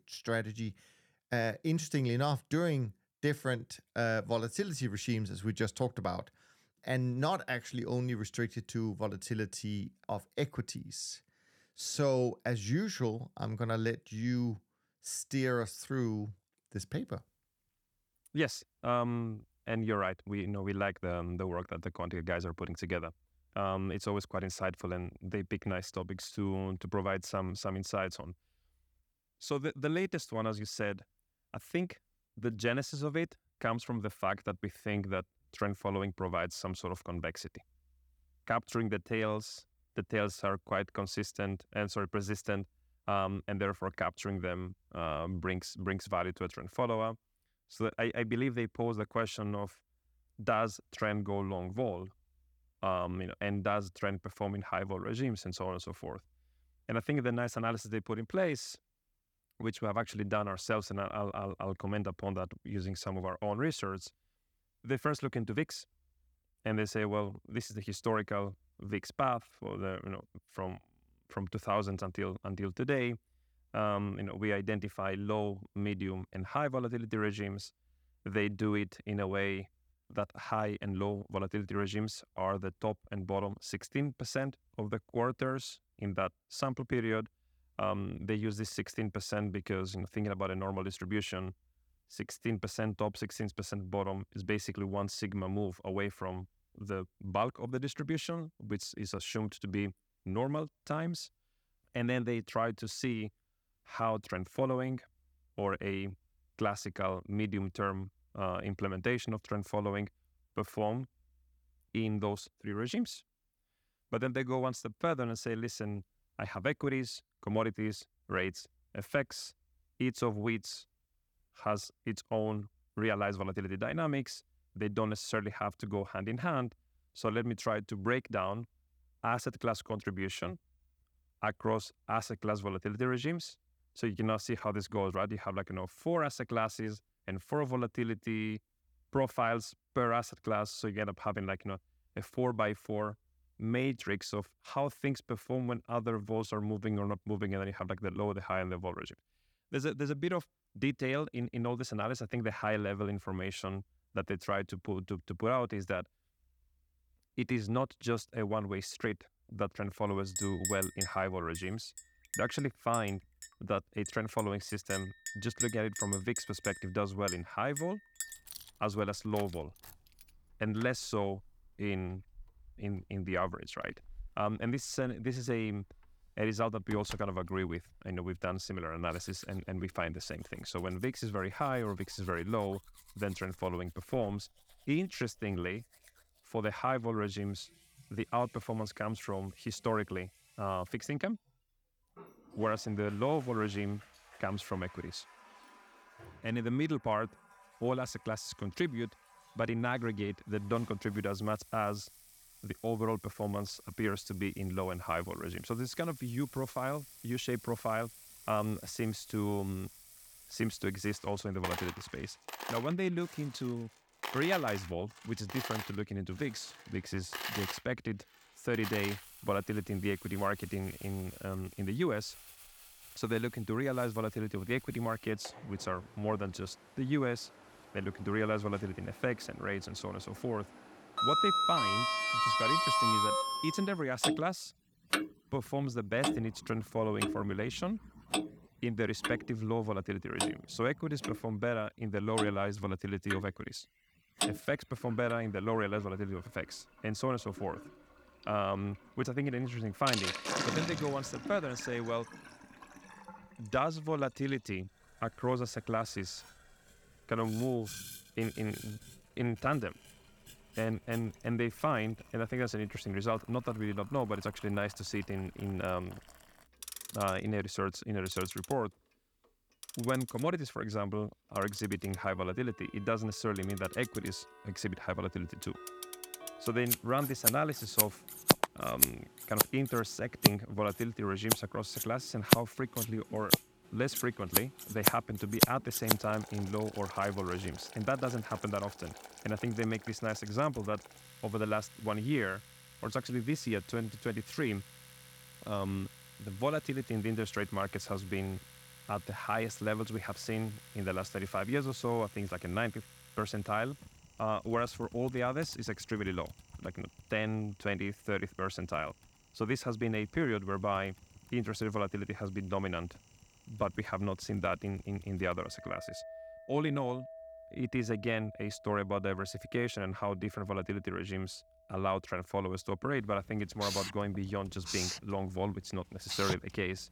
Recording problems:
household noises; very loud; from 2:40 on; 1 dB above the speech

